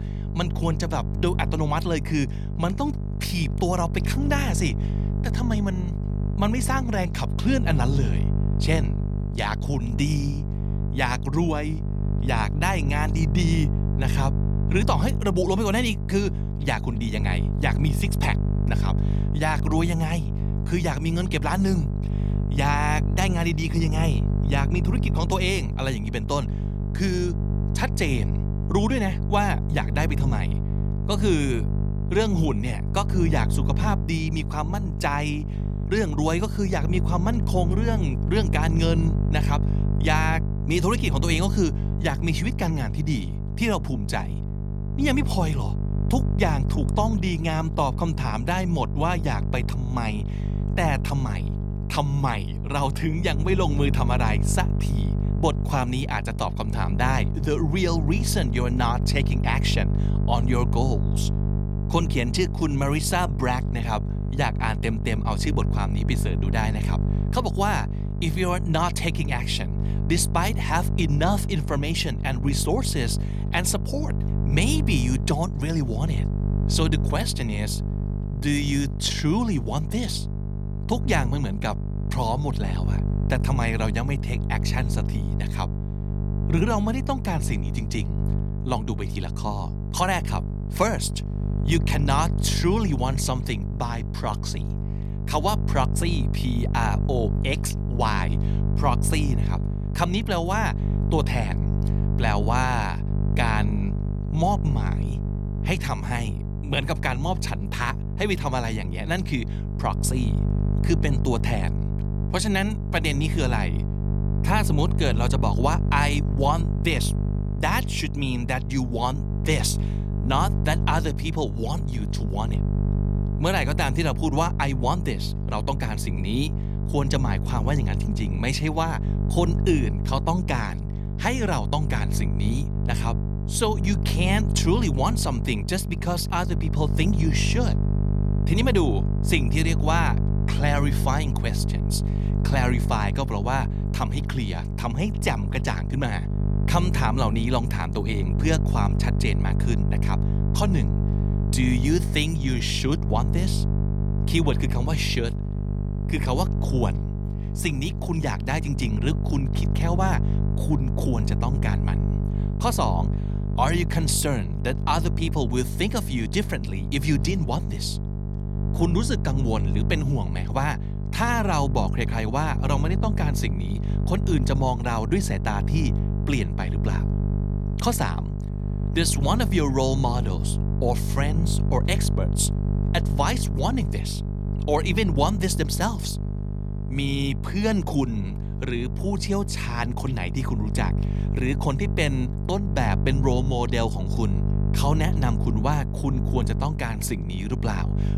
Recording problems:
electrical hum; loud; throughout; 50 Hz, 9 dB below the speech

